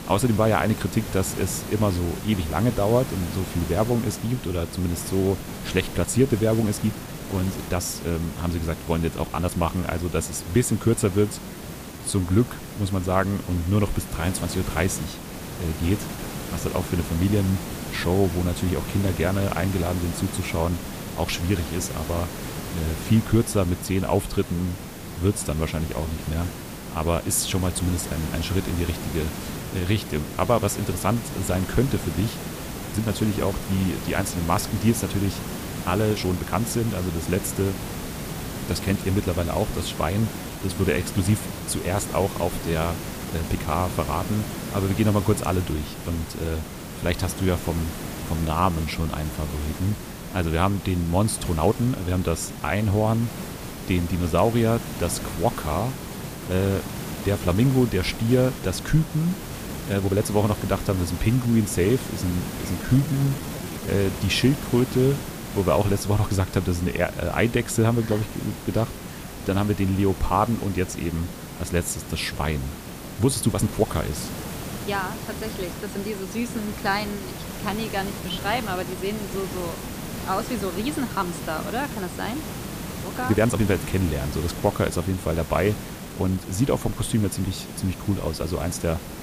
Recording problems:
hiss; loud; throughout; 8 dB below the speech
uneven, jittery; strongly; from 7 s to 1:27

